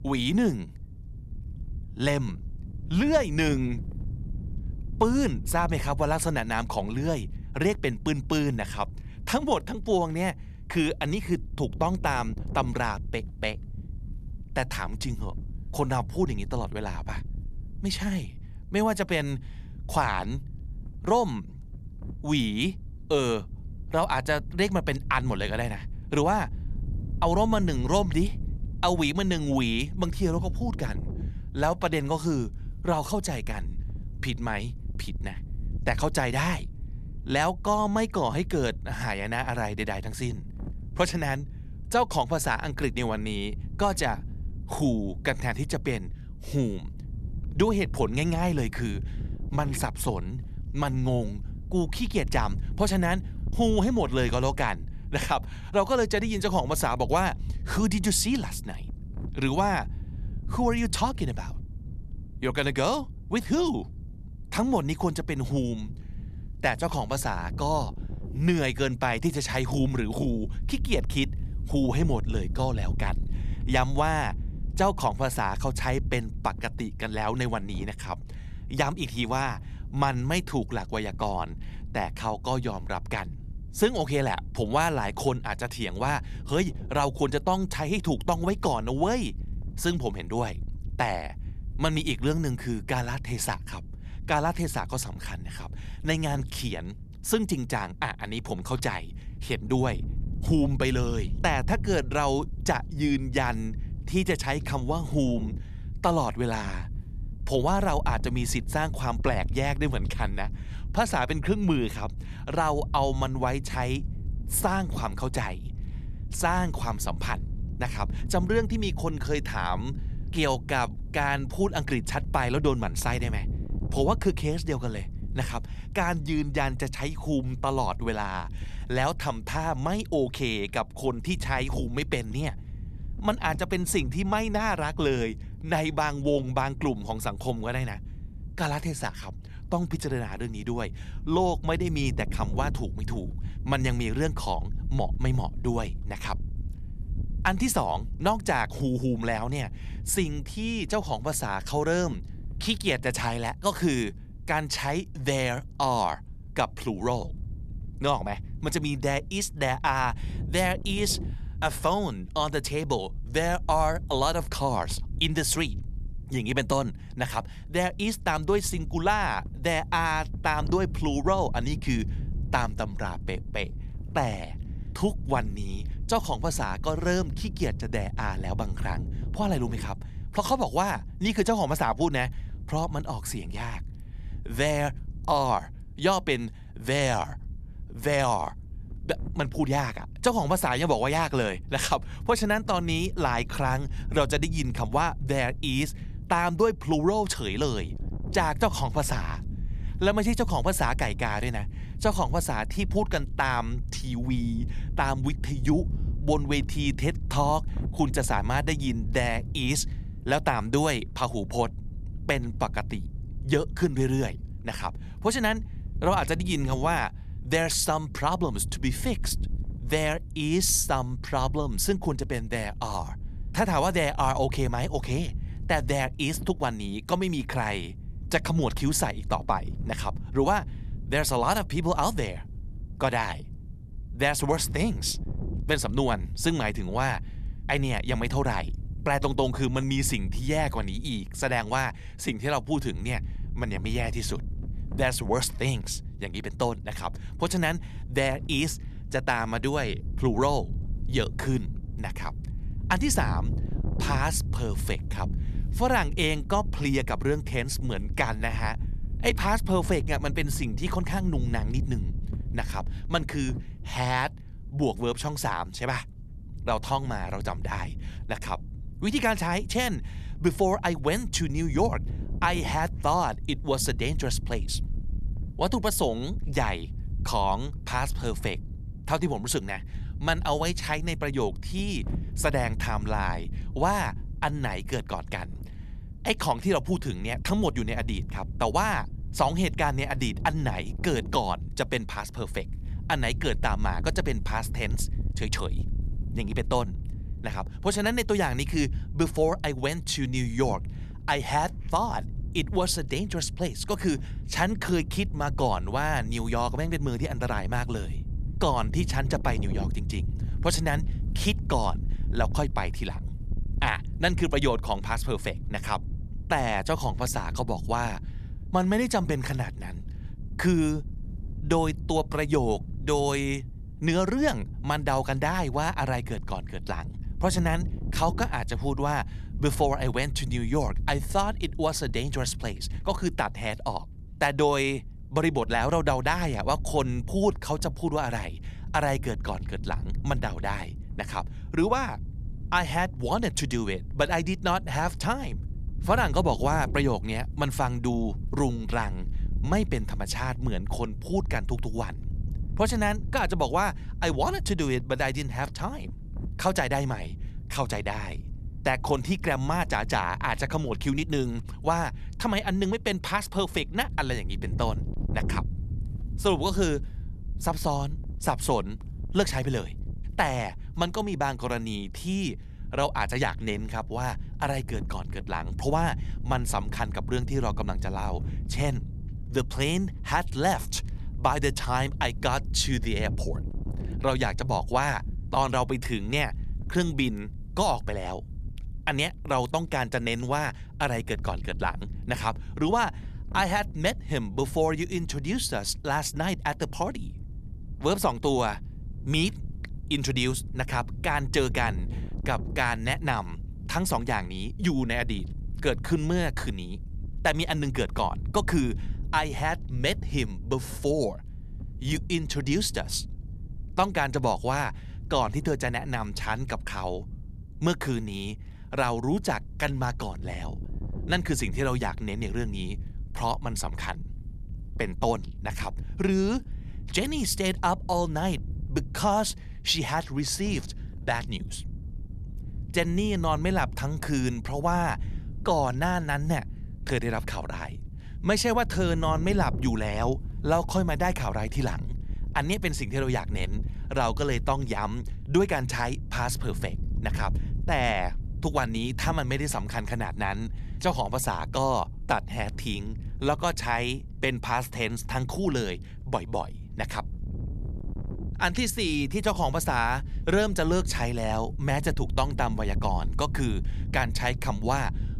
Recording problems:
wind noise on the microphone; occasional gusts; 20 dB below the speech

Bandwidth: 14 kHz